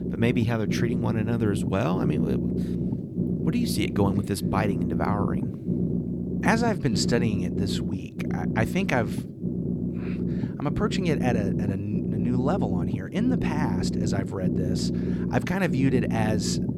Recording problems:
low rumble; loud; throughout; 5 dB below the speech

